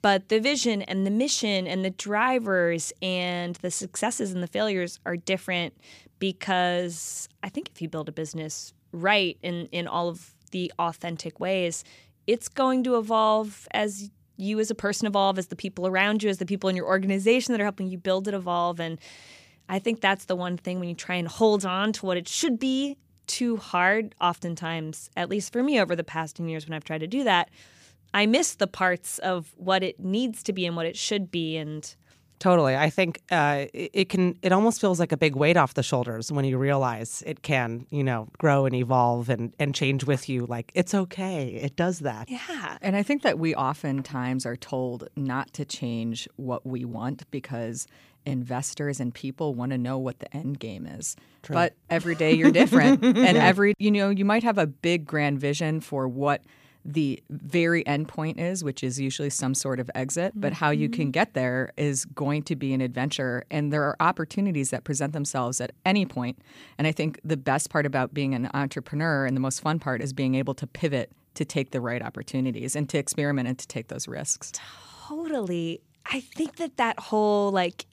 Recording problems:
none

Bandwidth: 15 kHz